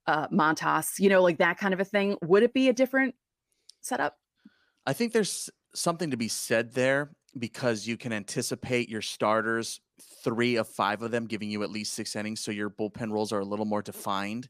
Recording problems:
none

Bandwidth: 15 kHz